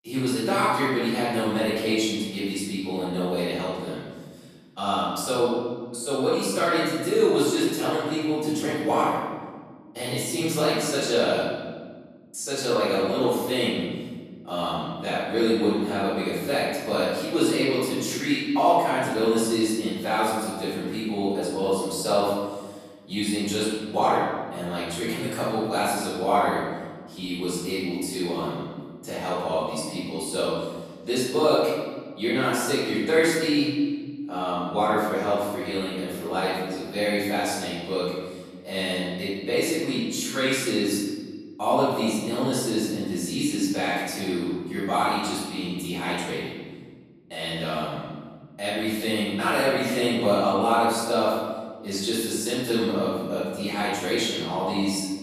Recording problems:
room echo; strong; dies away in 1.6 s
off-mic speech; far

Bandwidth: 14.5 kHz